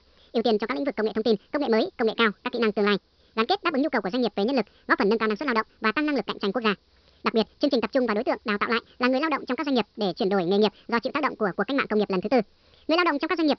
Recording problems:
wrong speed and pitch; too fast and too high; 1.7 times normal speed
high frequencies cut off; noticeable; nothing above 5.5 kHz
hiss; very faint; throughout; 40 dB below the speech

